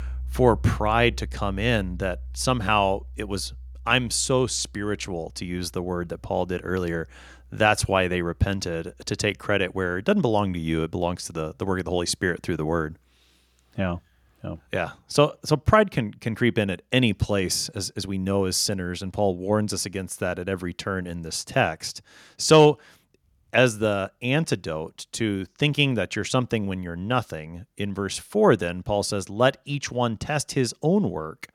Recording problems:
background music; noticeable; throughout; 15 dB below the speech

